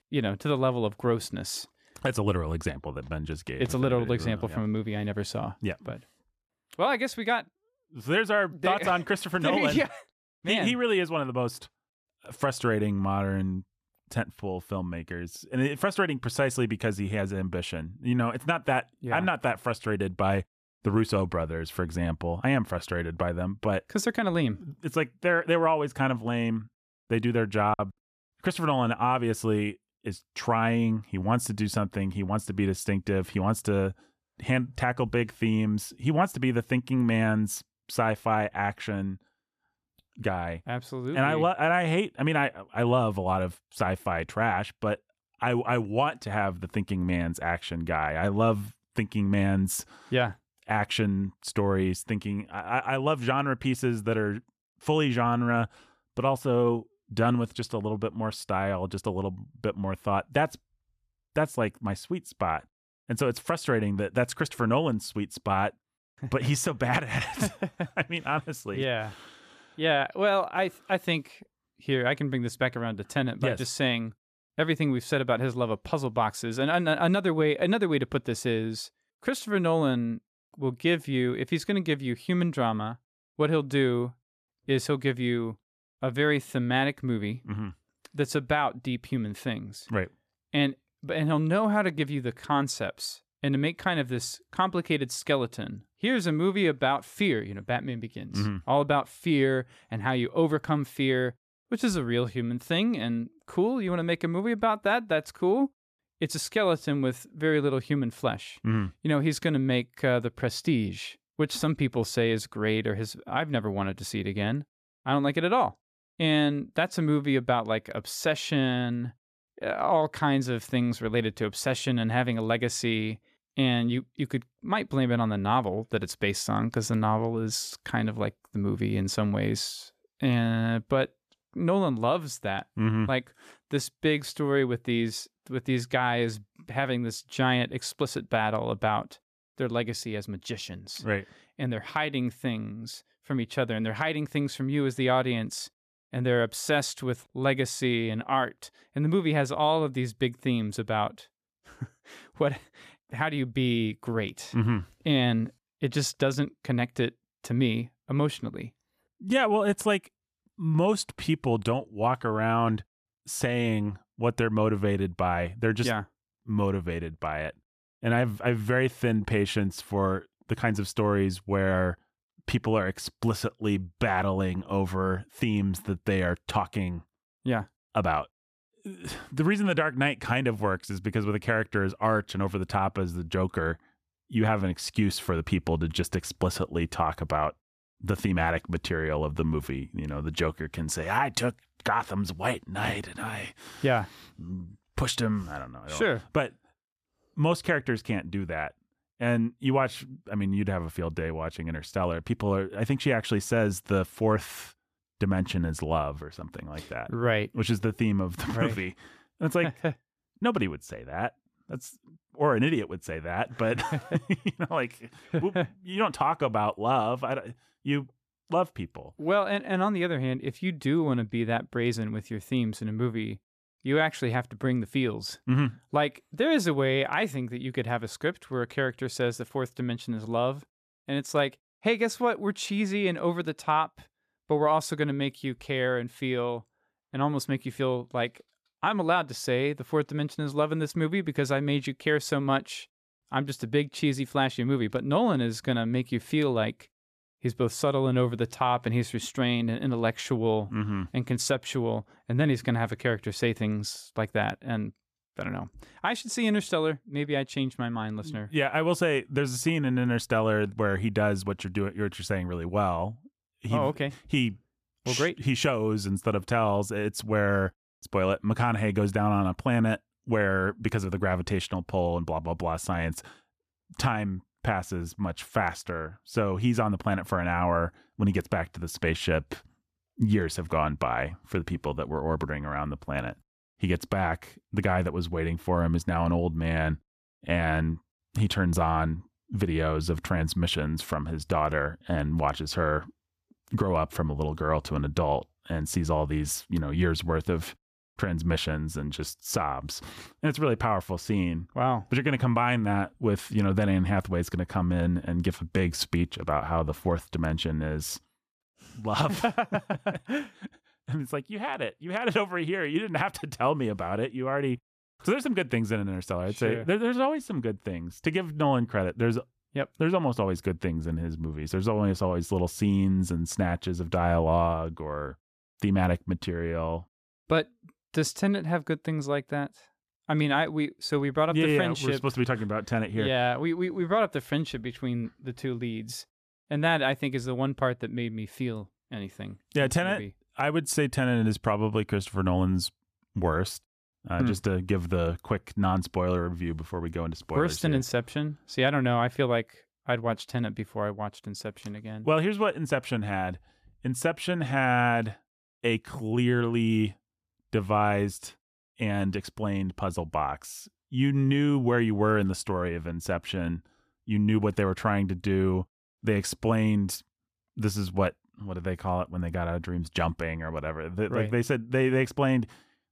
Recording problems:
choppy; very; at 28 s; 10% of the speech affected

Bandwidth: 14.5 kHz